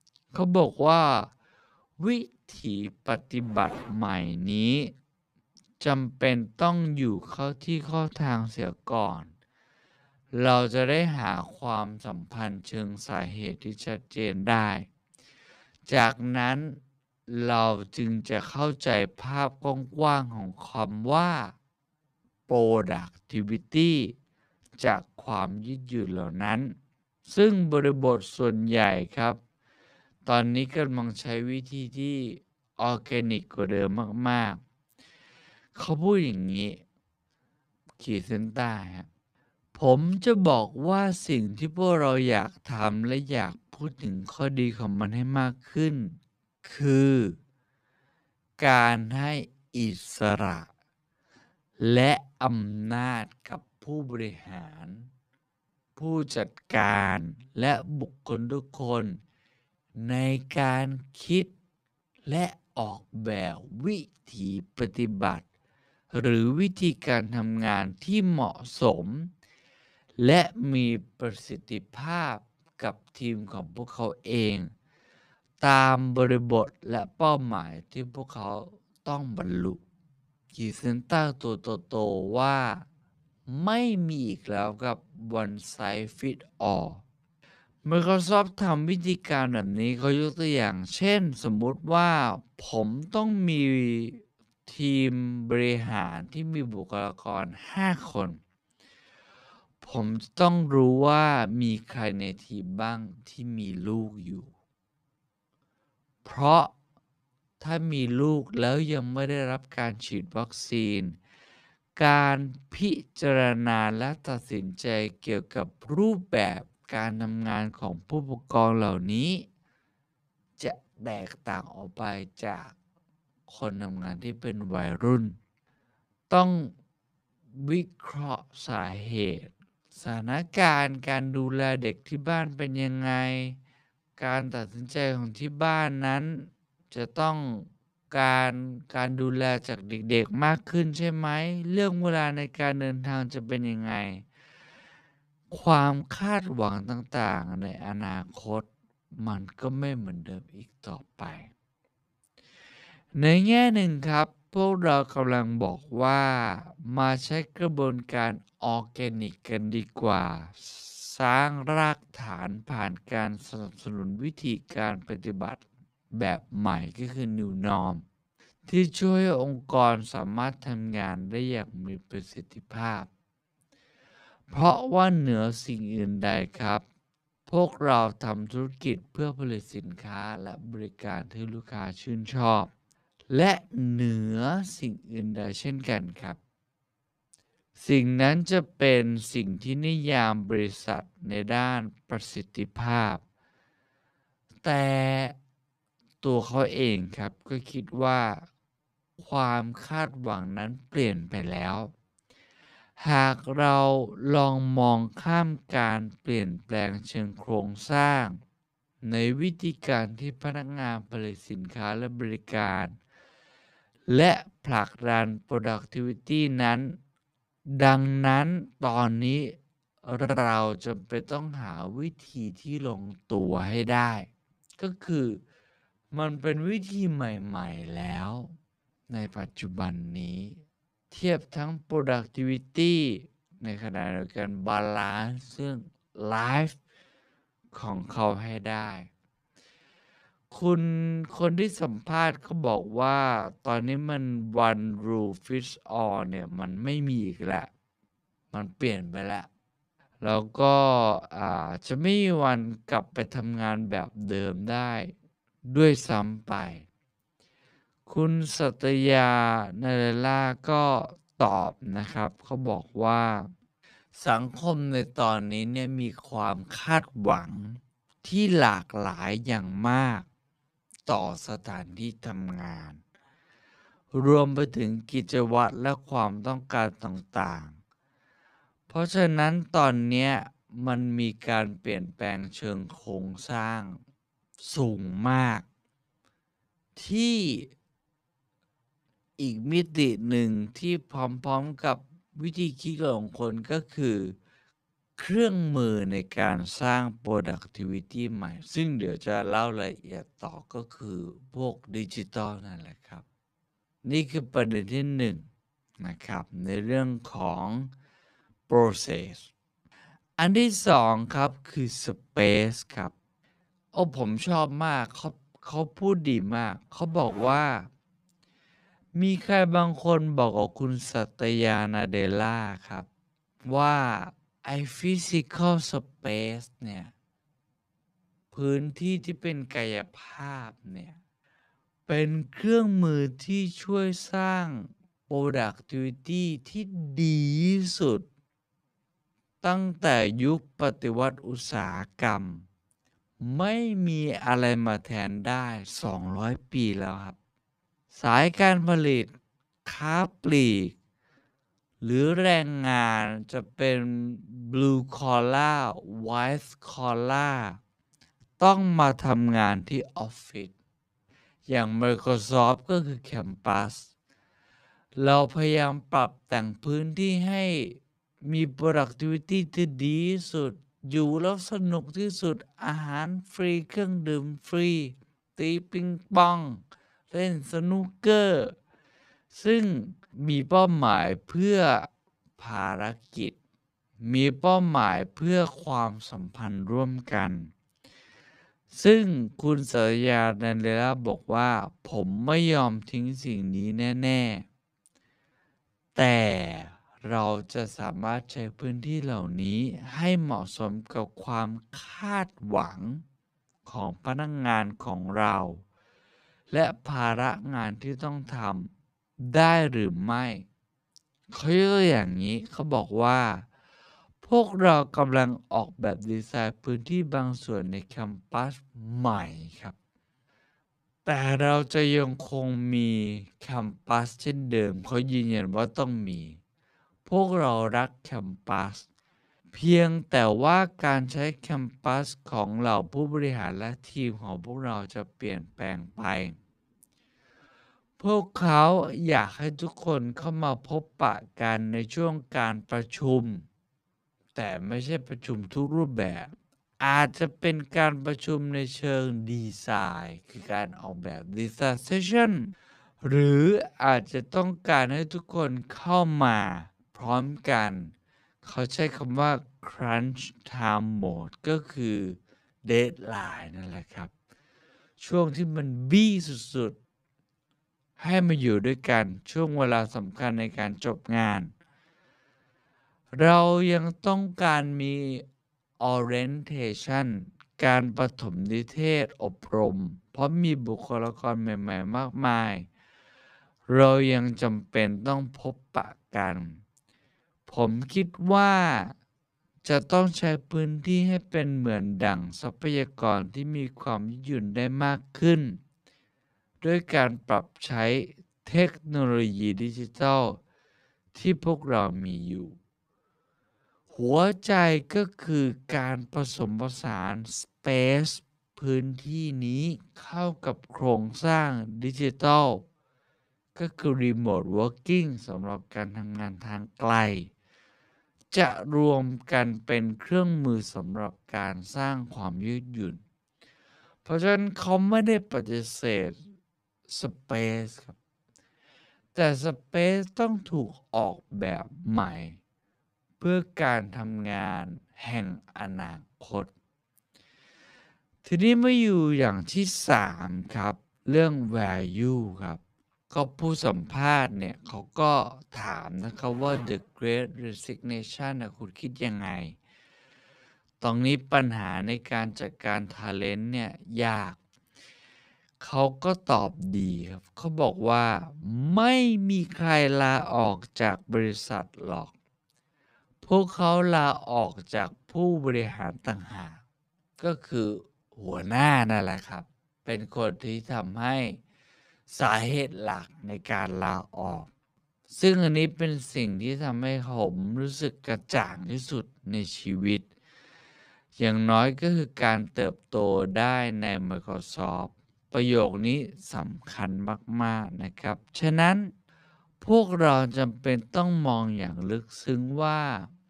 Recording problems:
wrong speed, natural pitch; too slow; 0.5 times normal speed

